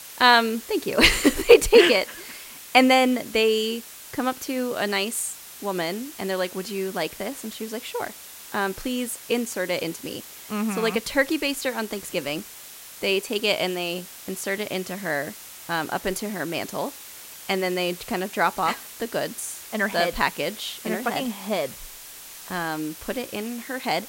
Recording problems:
hiss; noticeable; throughout; 15 dB below the speech

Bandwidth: 16 kHz